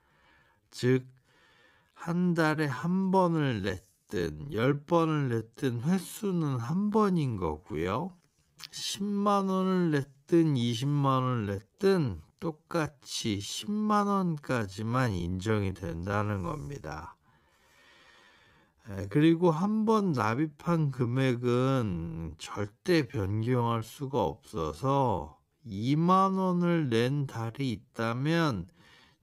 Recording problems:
wrong speed, natural pitch; too slow; 0.5 times normal speed

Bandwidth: 15.5 kHz